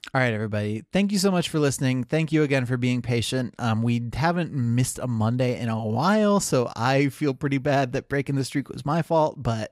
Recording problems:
none

